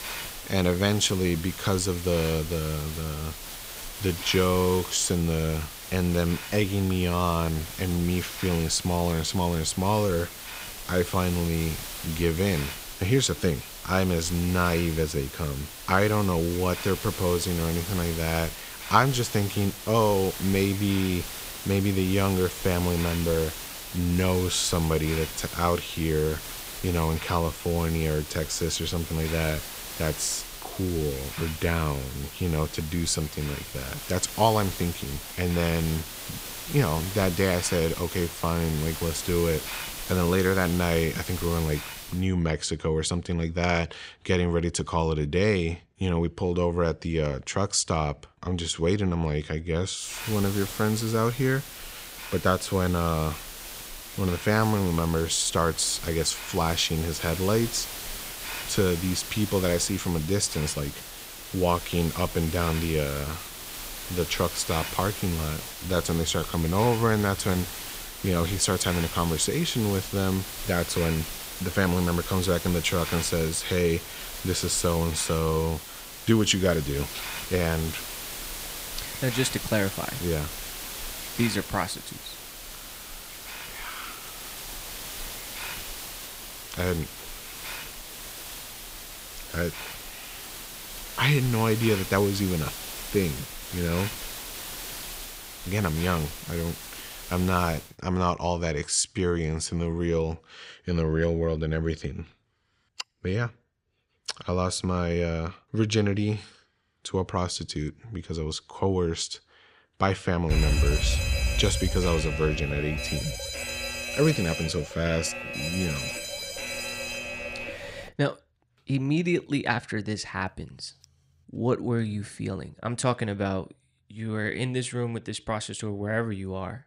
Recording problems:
hiss; loud; until 42 s and from 50 s to 1:38; 9 dB below the speech
alarm; loud; from 1:51 to 1:58; peak 3 dB above the speech

